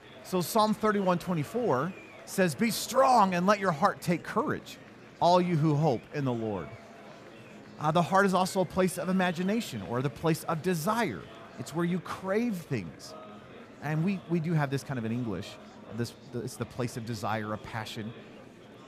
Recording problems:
murmuring crowd; noticeable; throughout; 20 dB below the speech

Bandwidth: 14.5 kHz